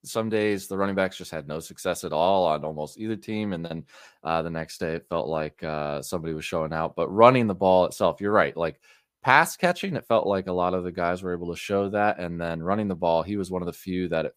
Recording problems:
none

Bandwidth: 15 kHz